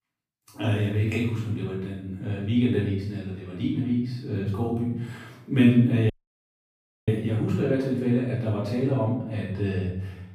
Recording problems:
off-mic speech; far
room echo; noticeable; dies away in 0.7 s
audio cutting out; at 6 s for 1 s

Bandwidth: 15 kHz